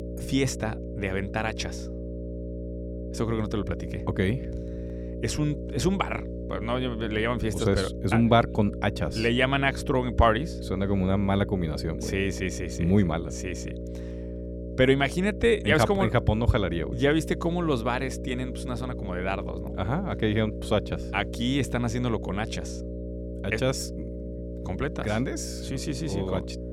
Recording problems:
electrical hum; noticeable; throughout; 60 Hz, 10 dB below the speech

